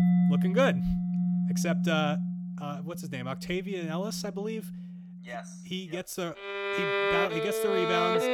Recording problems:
background music; very loud; throughout; 4 dB above the speech

